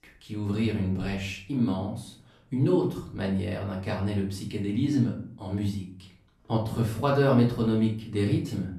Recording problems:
off-mic speech; far
room echo; slight; dies away in 0.4 s

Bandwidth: 13.5 kHz